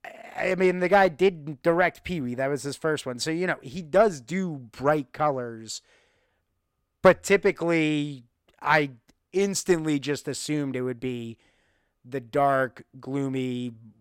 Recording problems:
none

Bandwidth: 16 kHz